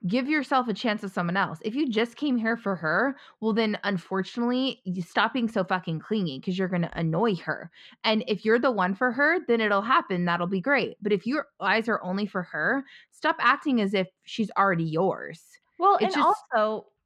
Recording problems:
muffled; slightly; fading above 3 kHz

